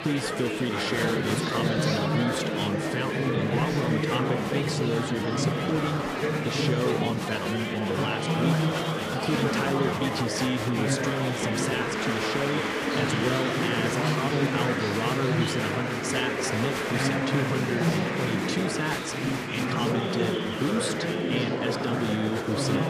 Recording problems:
murmuring crowd; very loud; throughout; 3 dB above the speech

